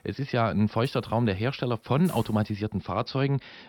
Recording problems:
high frequencies cut off; noticeable; nothing above 5.5 kHz
hiss; very faint; throughout; 20 dB below the speech

